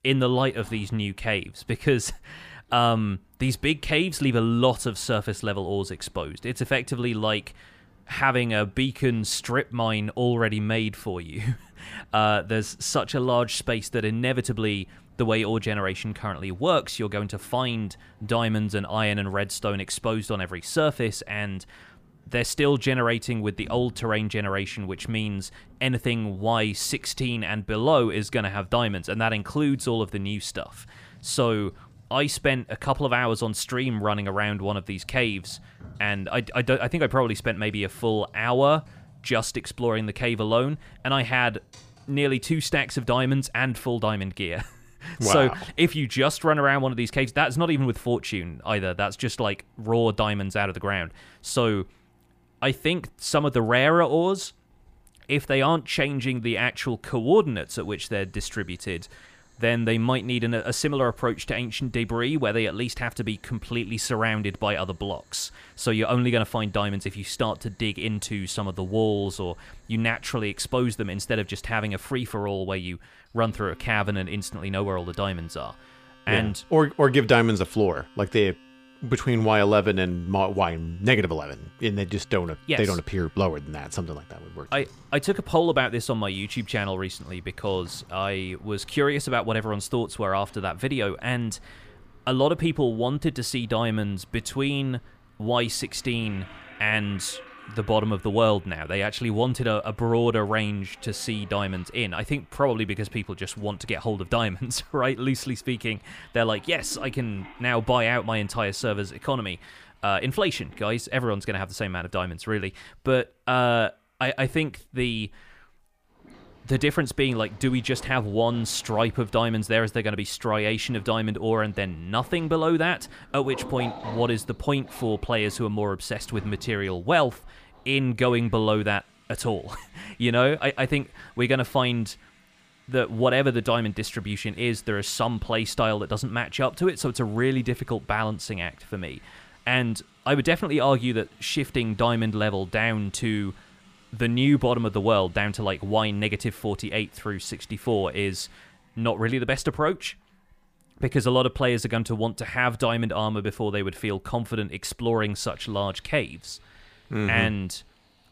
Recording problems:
household noises; faint; throughout; 25 dB below the speech

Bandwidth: 15 kHz